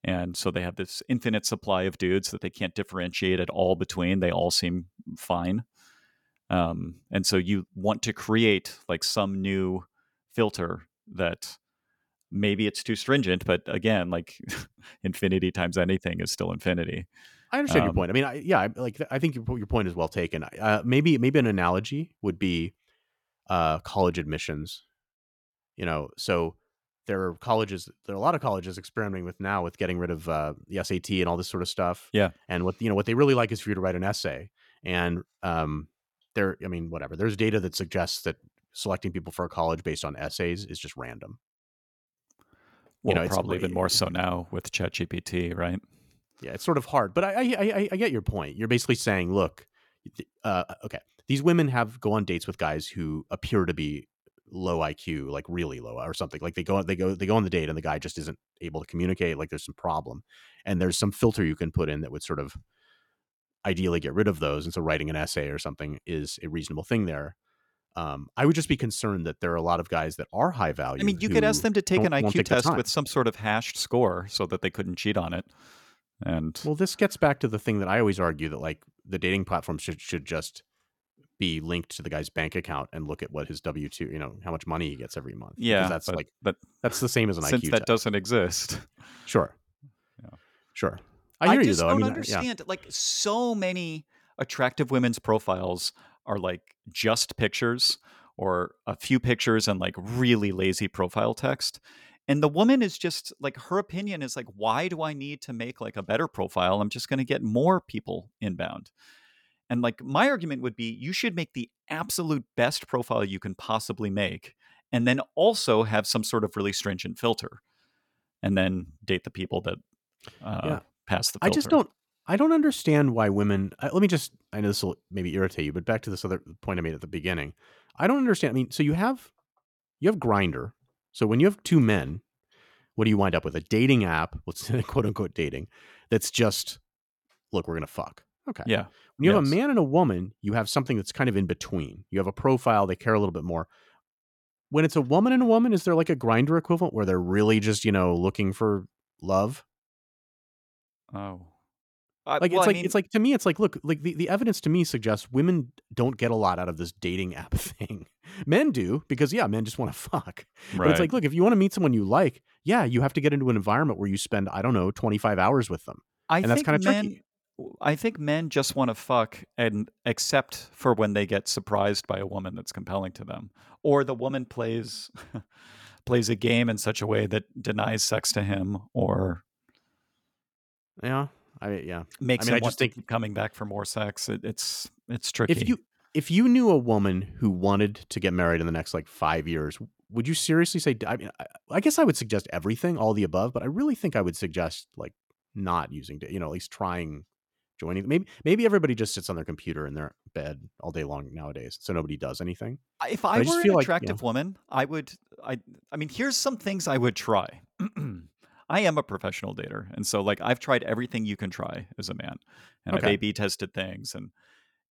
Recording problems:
none

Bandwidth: 18 kHz